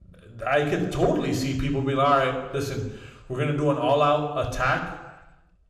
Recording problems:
room echo; slight; dies away in 0.9 s
off-mic speech; somewhat distant

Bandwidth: 14.5 kHz